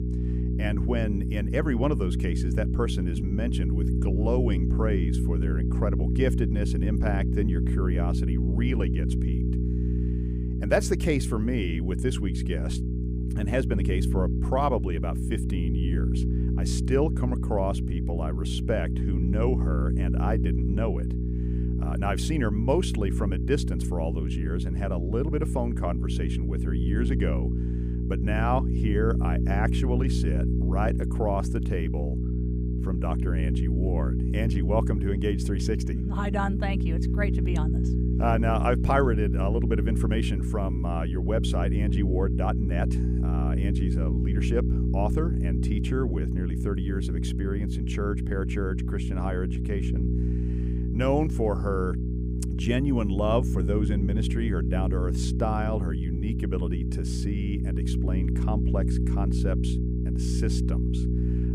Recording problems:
electrical hum; loud; throughout; 60 Hz, 5 dB below the speech

